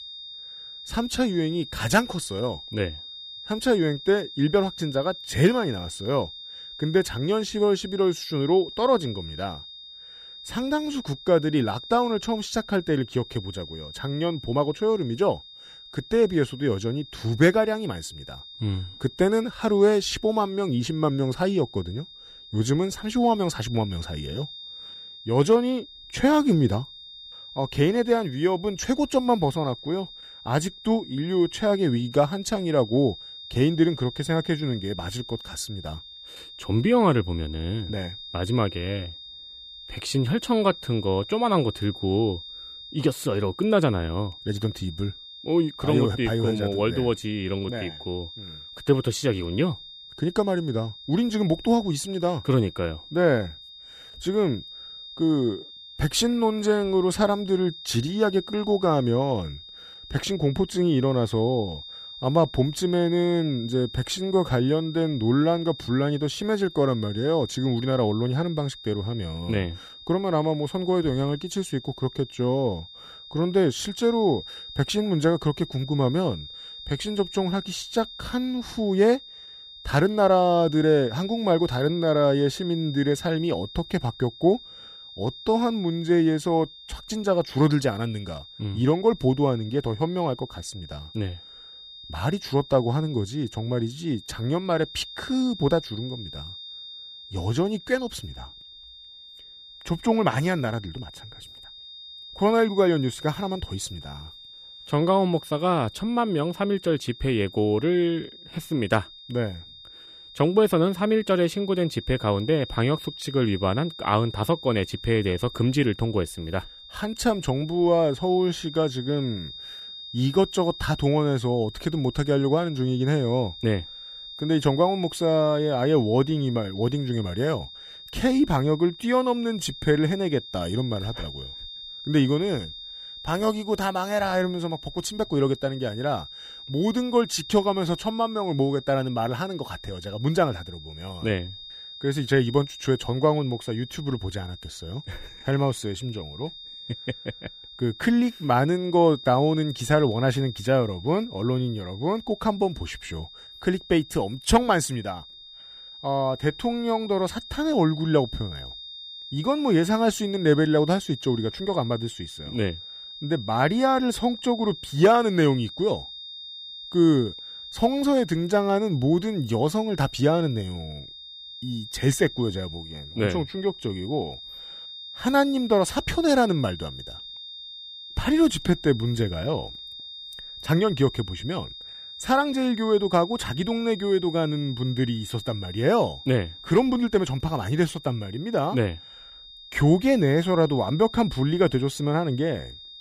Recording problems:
high-pitched whine; noticeable; throughout; 3.5 kHz, 15 dB below the speech

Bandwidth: 15 kHz